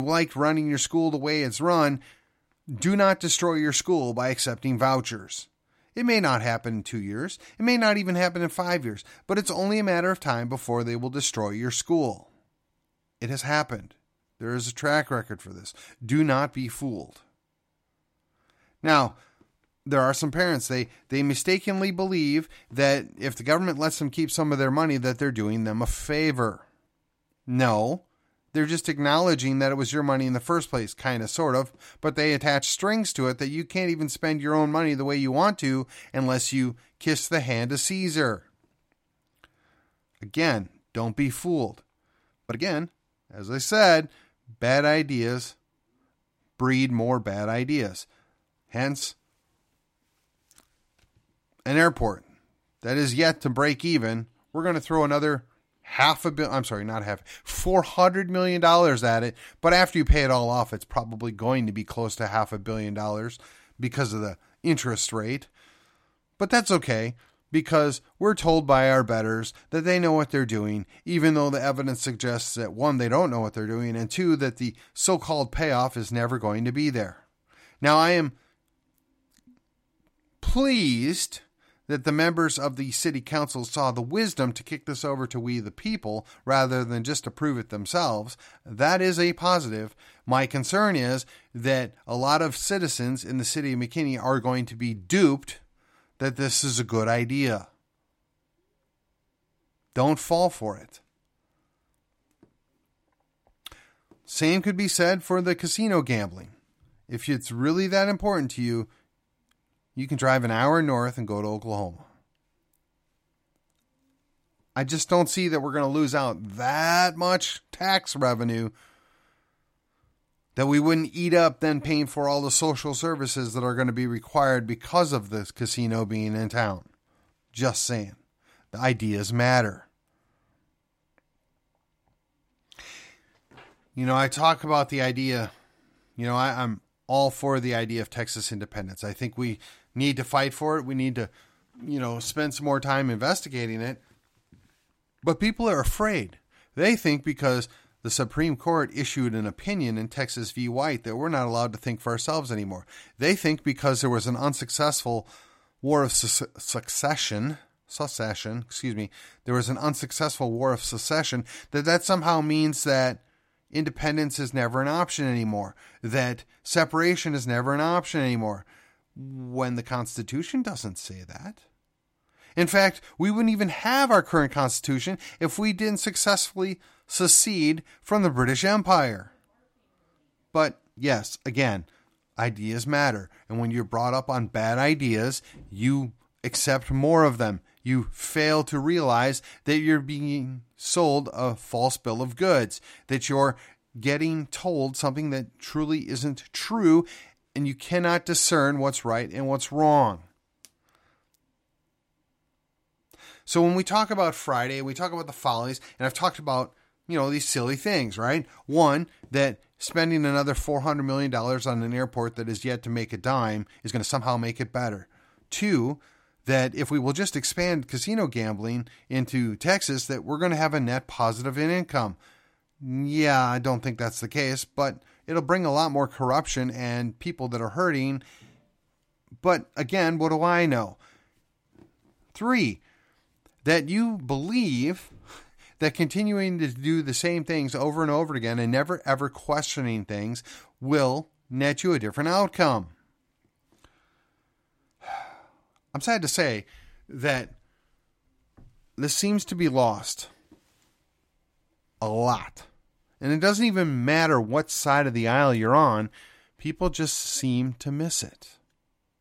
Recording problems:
abrupt cut into speech; at the start
uneven, jittery; strongly; from 13 s to 4:02

